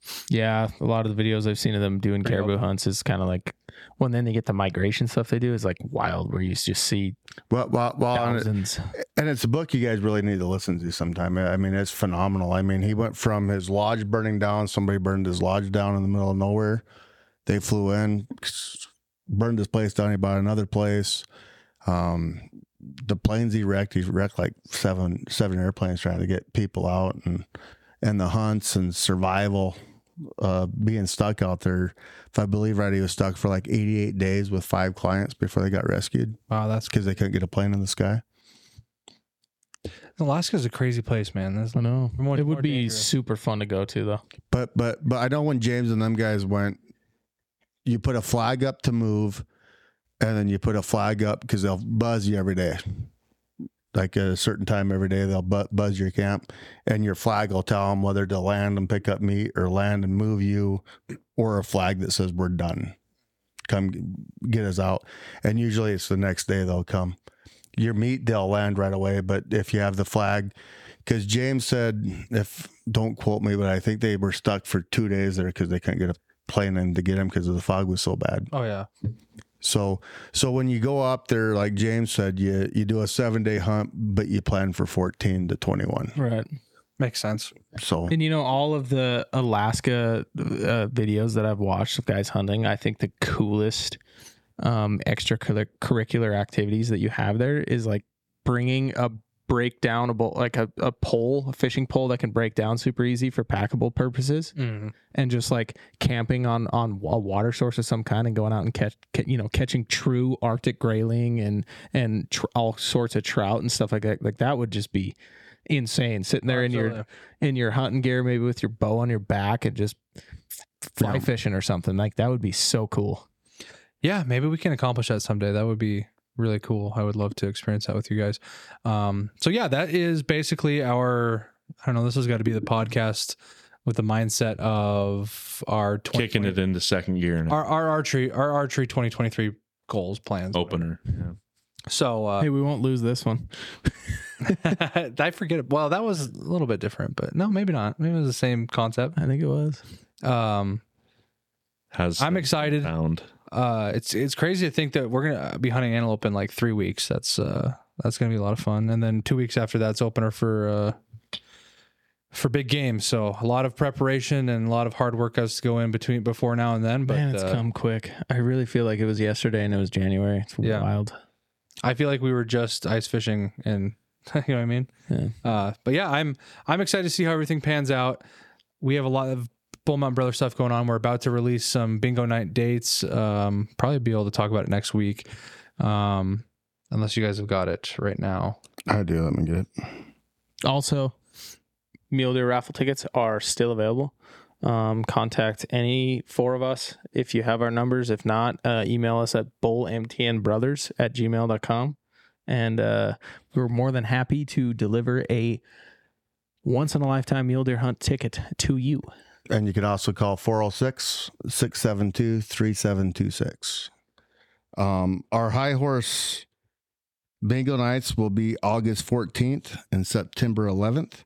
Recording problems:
squashed, flat; somewhat

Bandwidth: 17 kHz